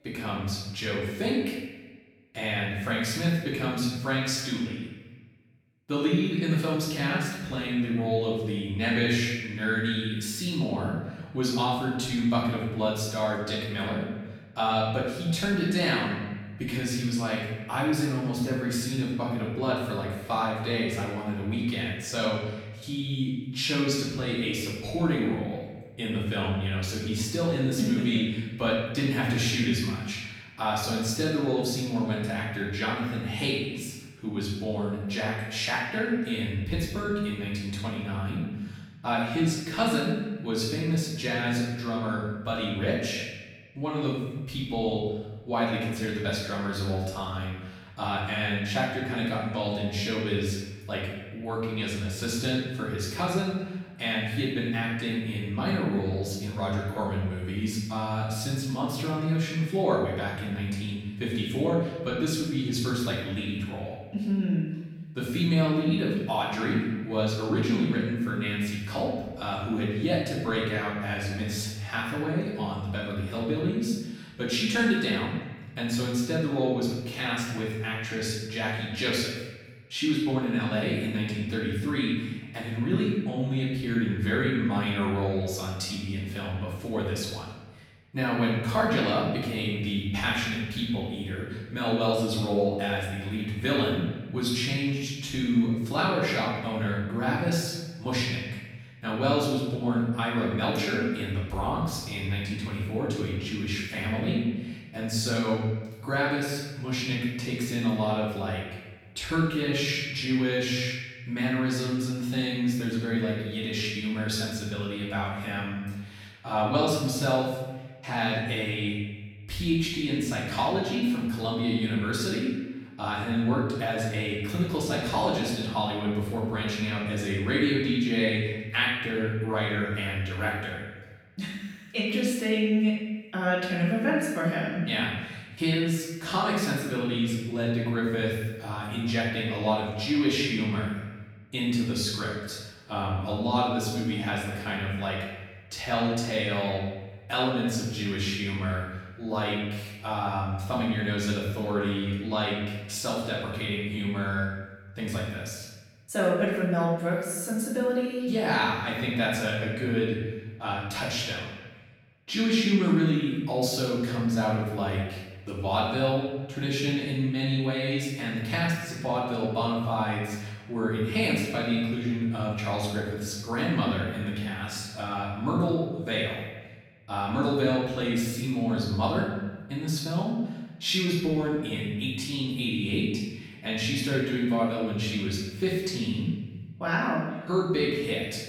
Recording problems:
off-mic speech; far
room echo; noticeable; dies away in 1 s
echo of what is said; faint; throughout; 280 ms later, 25 dB below the speech

